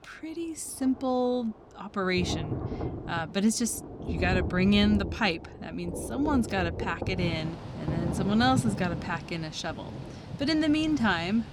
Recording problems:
rain or running water; loud; throughout; 7 dB below the speech

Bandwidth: 19 kHz